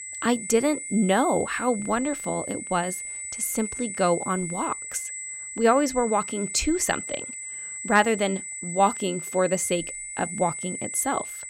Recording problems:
high-pitched whine; loud; throughout; 8 kHz, 7 dB below the speech

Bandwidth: 16 kHz